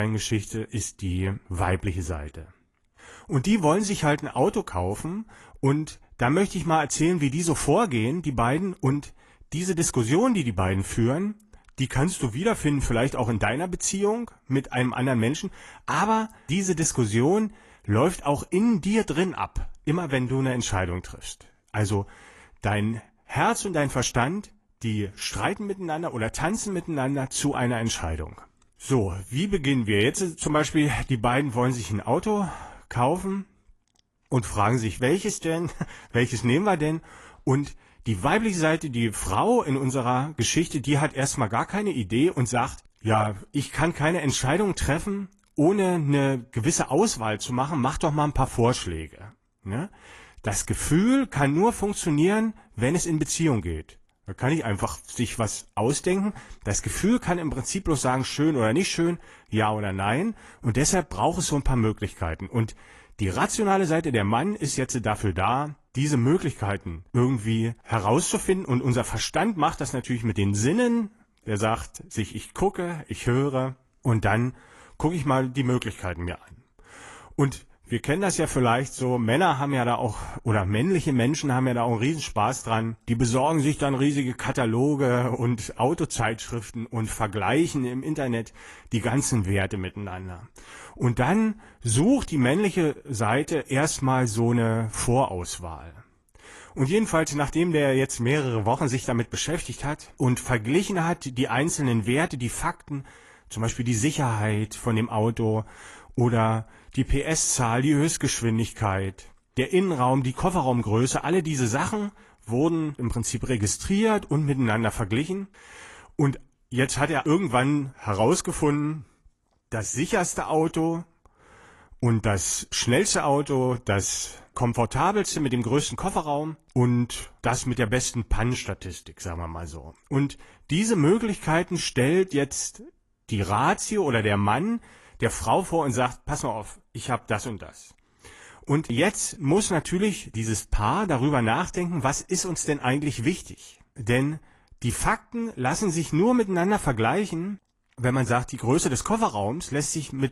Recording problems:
garbled, watery; slightly; nothing above 11.5 kHz
abrupt cut into speech; at the start

